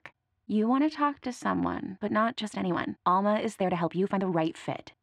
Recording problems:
muffled; slightly; fading above 2.5 kHz
uneven, jittery; strongly; from 1 to 4.5 s

